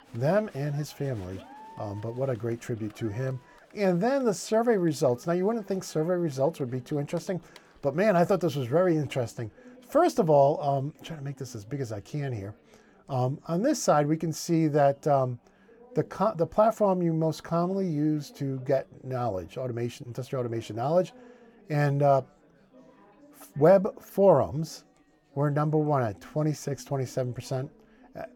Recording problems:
chatter from many people; faint; throughout; 25 dB below the speech

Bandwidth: 18 kHz